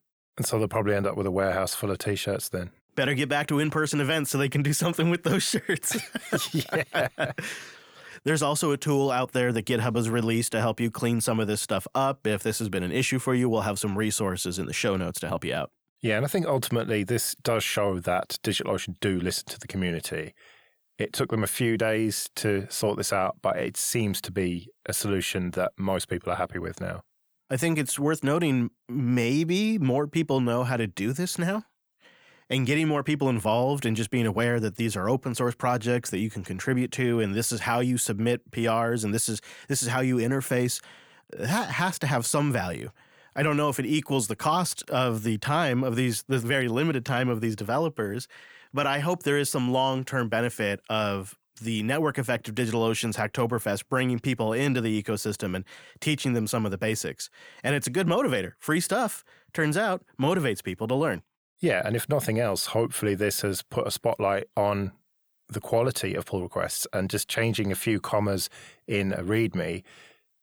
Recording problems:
none

